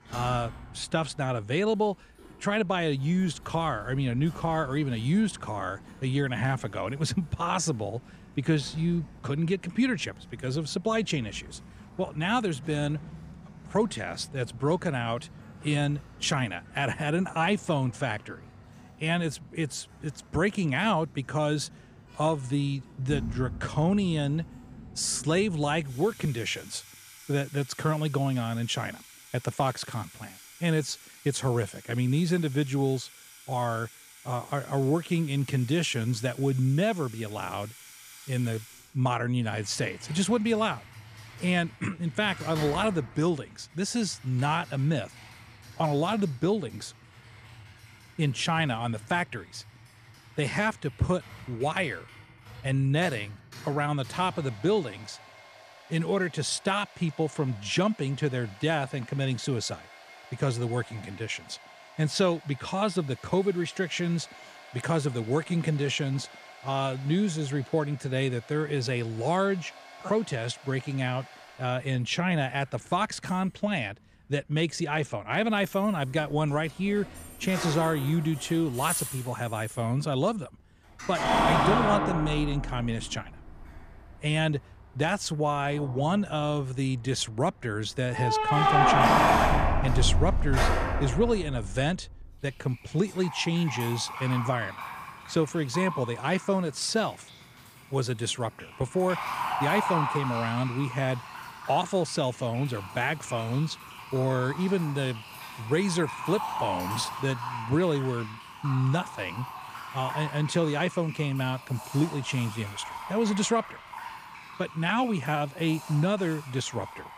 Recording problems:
household noises; loud; throughout; 4 dB below the speech

